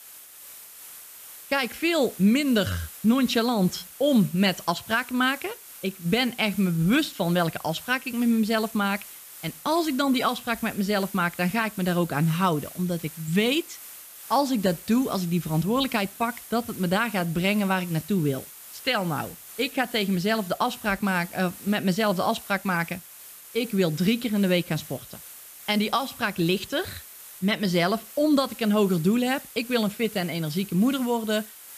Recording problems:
hiss; noticeable; throughout; 15 dB below the speech

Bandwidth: 14.5 kHz